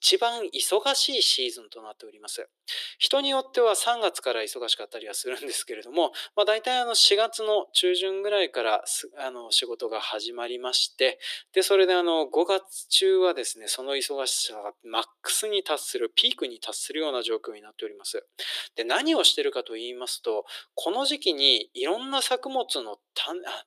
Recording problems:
thin; very; fading below 350 Hz

